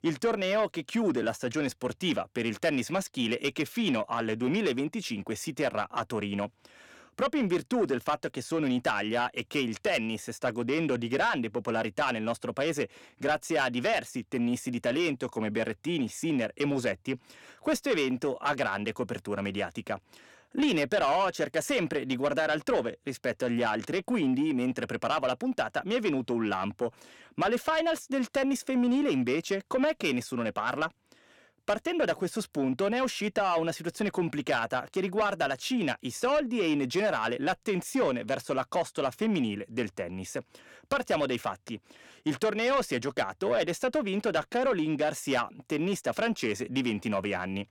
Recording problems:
distortion; slight; 10 dB below the speech

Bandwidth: 17 kHz